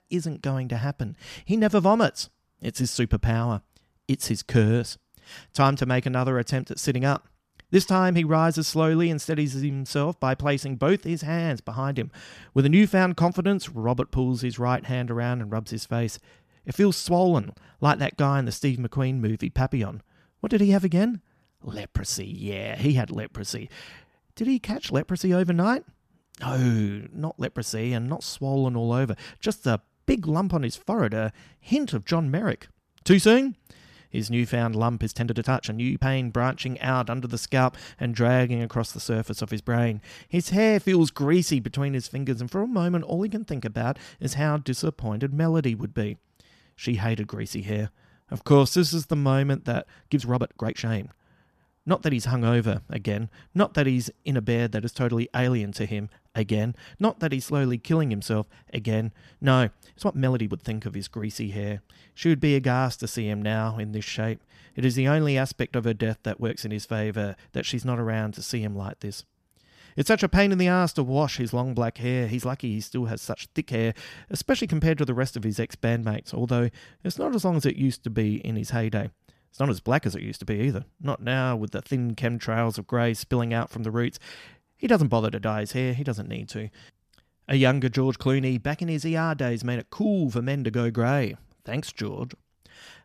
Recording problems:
uneven, jittery; strongly; from 31 s to 1:21

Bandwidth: 14.5 kHz